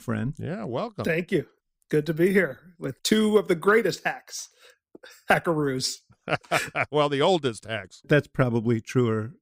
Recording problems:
none

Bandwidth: 15.5 kHz